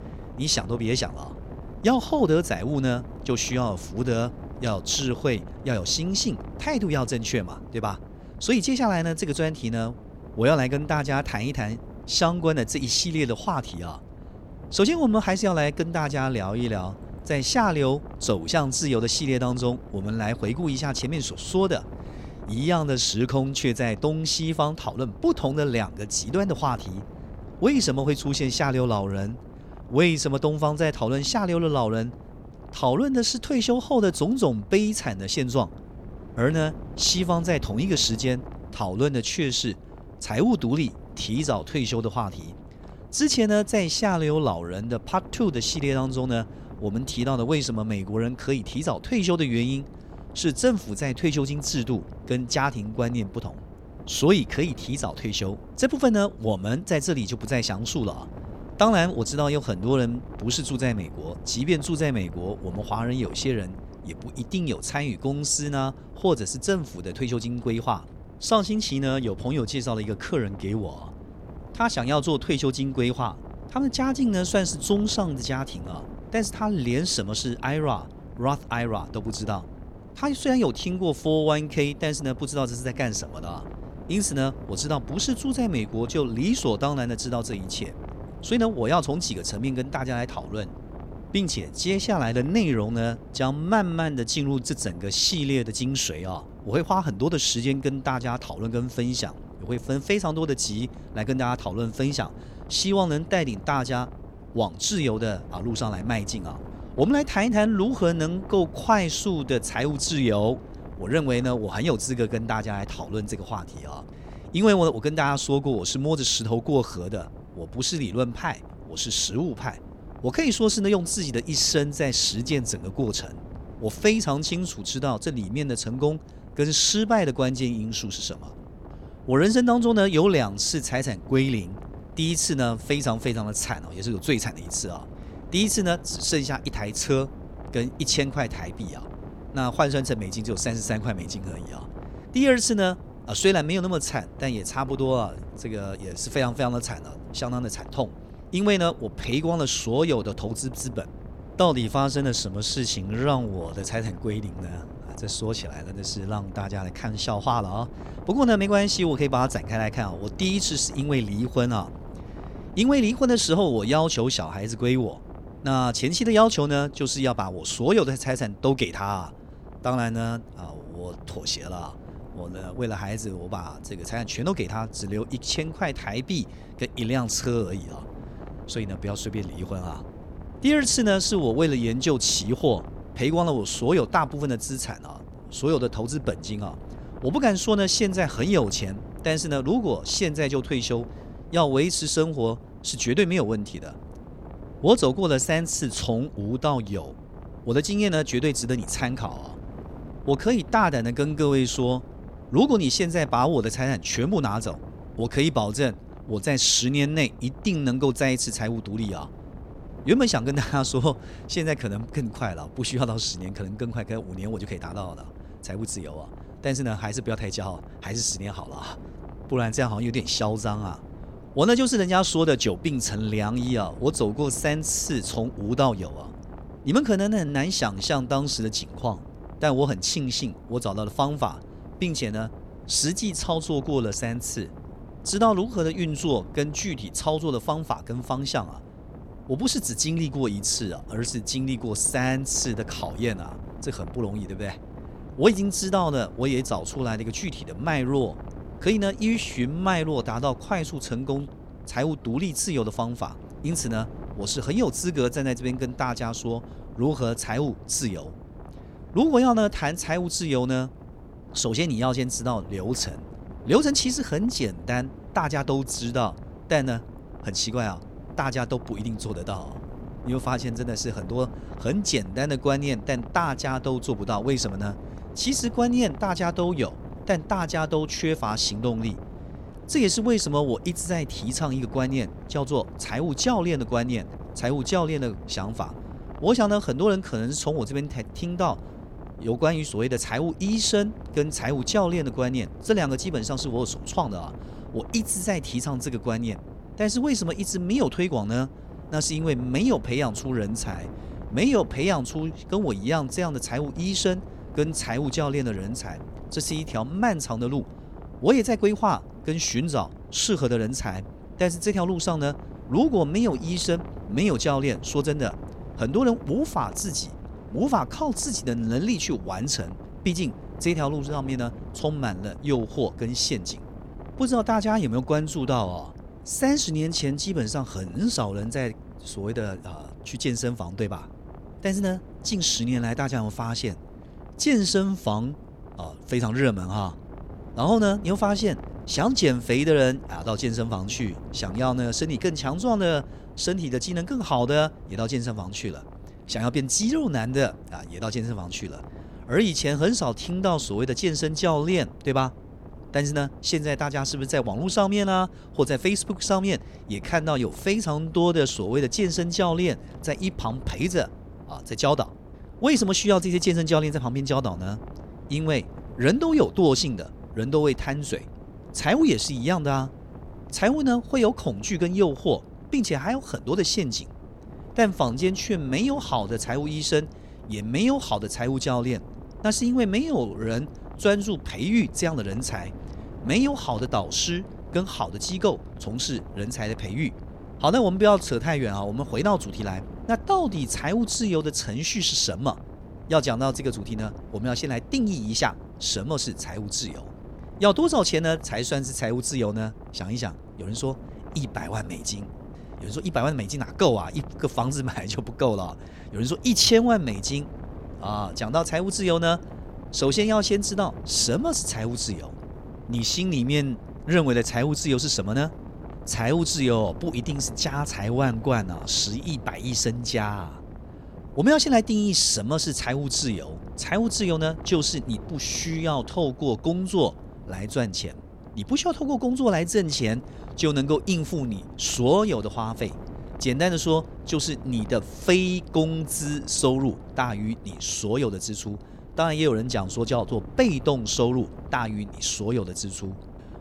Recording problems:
wind noise on the microphone; occasional gusts; 20 dB below the speech

